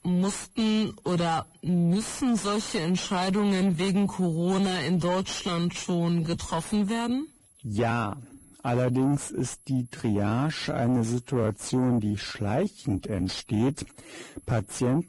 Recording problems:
garbled, watery; badly; nothing above 10.5 kHz
wrong speed, natural pitch; too slow; 0.7 times normal speed
distortion; slight; 10 dB below the speech
high-pitched whine; faint; throughout; 11 kHz, 30 dB below the speech

